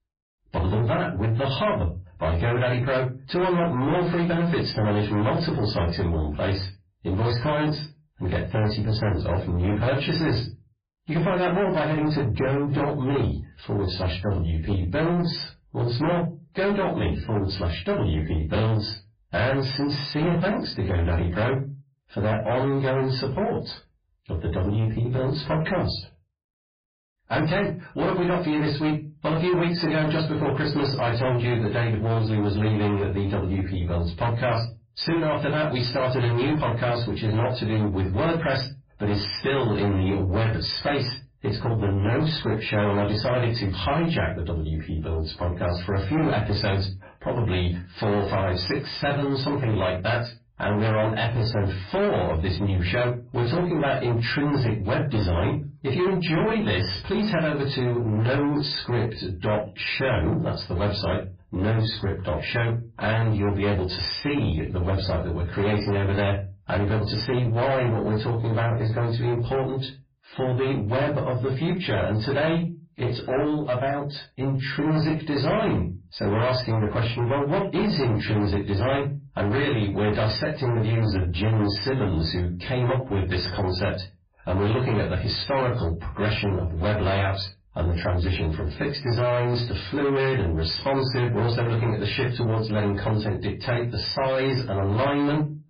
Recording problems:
distortion; heavy; 8 dB below the speech
off-mic speech; far
garbled, watery; badly; nothing above 5 kHz
room echo; very slight; dies away in 0.2 s

